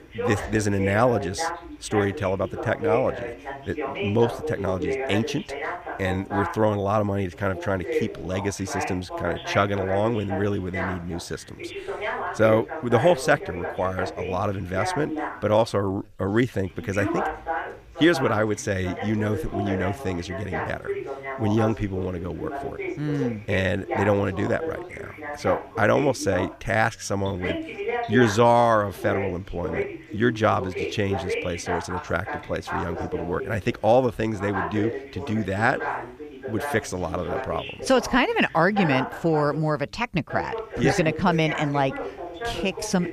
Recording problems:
background chatter; loud; throughout; 2 voices, 7 dB below the speech

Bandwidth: 15 kHz